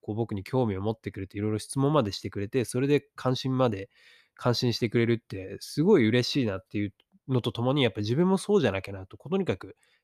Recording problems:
none

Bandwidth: 14.5 kHz